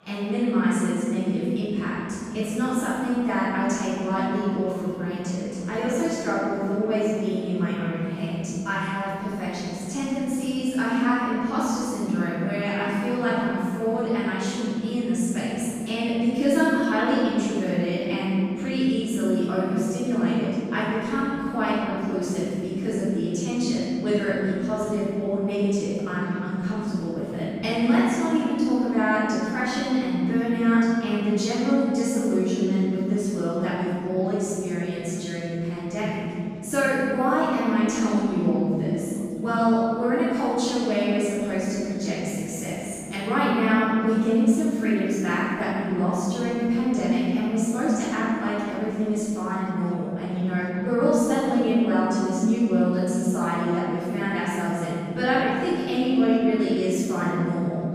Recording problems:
room echo; strong; dies away in 3 s
off-mic speech; far
murmuring crowd; faint; throughout; 25 dB below the speech

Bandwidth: 15 kHz